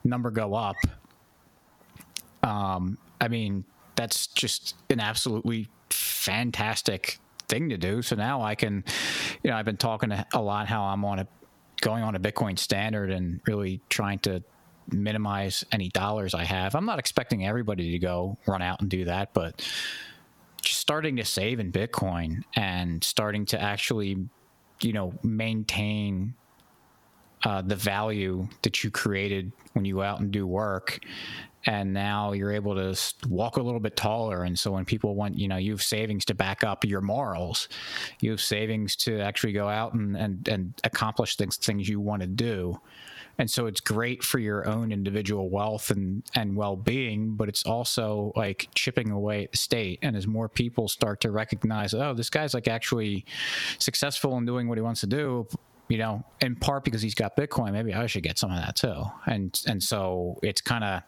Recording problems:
squashed, flat; heavily

